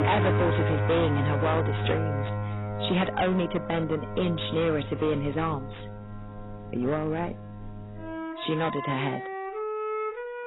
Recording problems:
distortion; heavy; 9% of the sound clipped
garbled, watery; badly; nothing above 4 kHz
background music; loud; throughout; 4 dB below the speech

